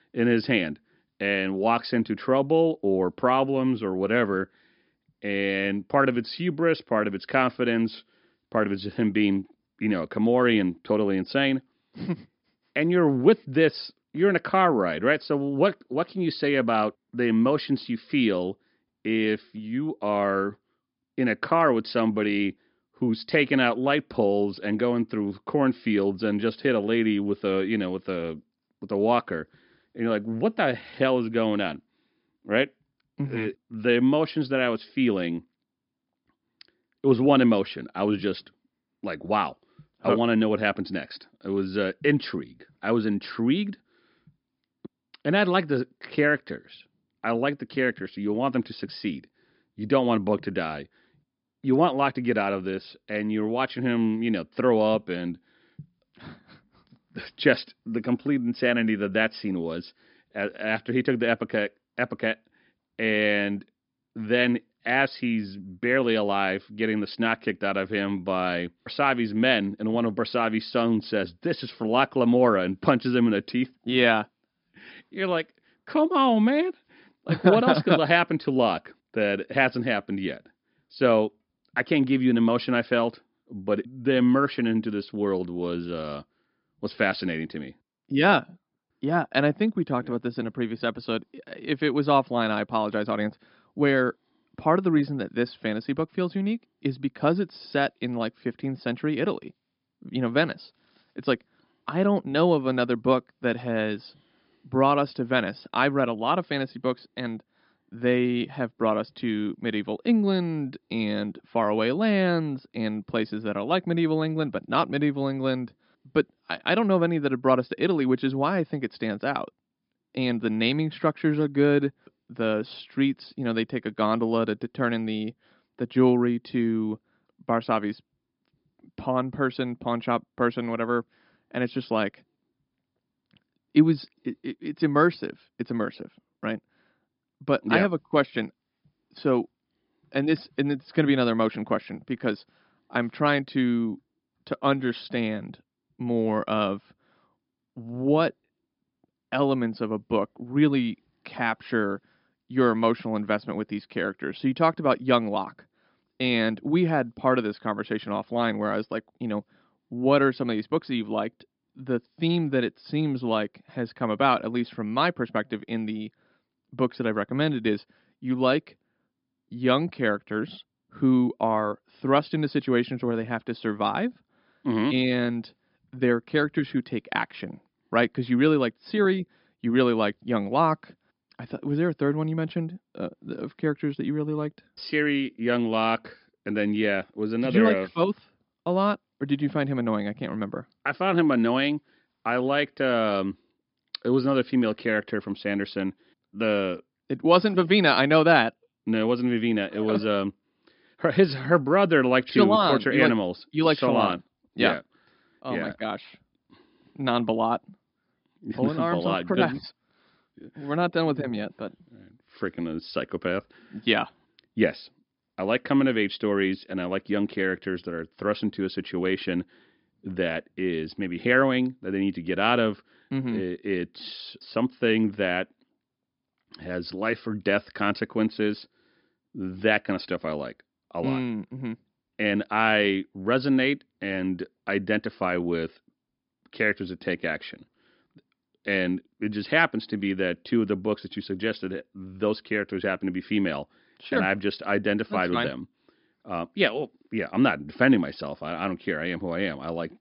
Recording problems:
high frequencies cut off; noticeable; nothing above 5.5 kHz

